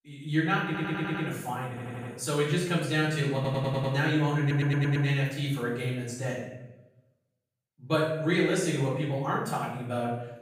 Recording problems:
off-mic speech; far
room echo; noticeable; dies away in 0.8 s
audio stuttering; 4 times, first at 0.5 s

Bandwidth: 15 kHz